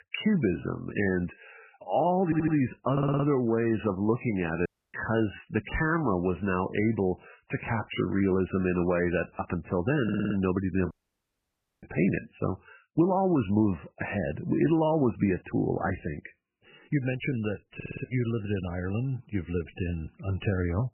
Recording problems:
garbled, watery; badly; nothing above 3 kHz
audio stuttering; 4 times, first at 2 s
audio cutting out; at 4.5 s and at 11 s for 1 s

